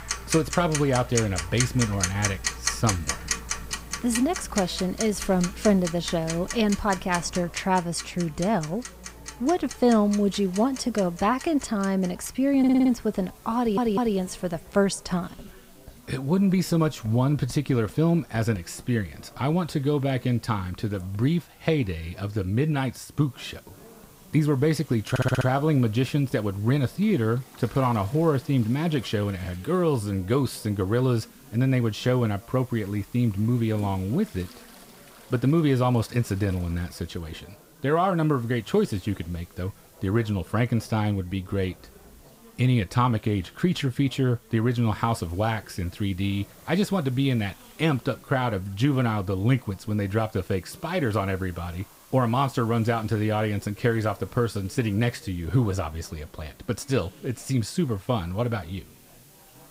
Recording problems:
household noises; loud; throughout; 9 dB below the speech
background chatter; faint; throughout; 4 voices, 25 dB below the speech
hiss; faint; throughout; 25 dB below the speech
audio stuttering; at 13 s, at 14 s and at 25 s

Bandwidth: 15.5 kHz